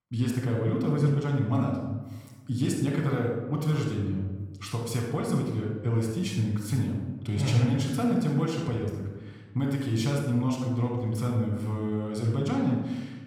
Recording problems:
room echo; noticeable; dies away in 1.1 s
off-mic speech; somewhat distant

